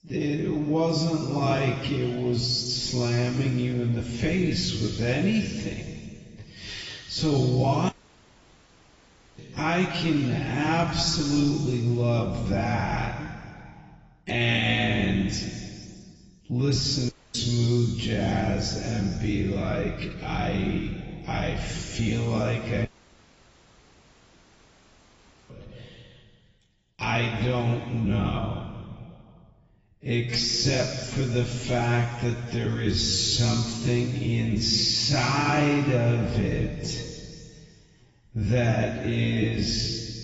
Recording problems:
garbled, watery; badly; nothing above 7.5 kHz
wrong speed, natural pitch; too slow; 0.5 times normal speed
room echo; noticeable; dies away in 2.2 s
off-mic speech; somewhat distant
audio cutting out; at 8 s for 1.5 s, at 17 s and at 23 s for 2.5 s

